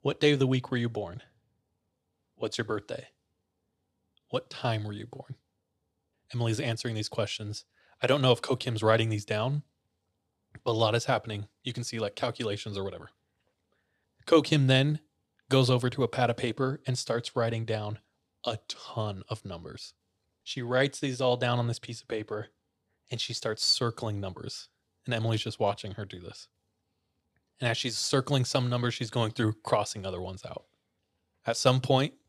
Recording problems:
none

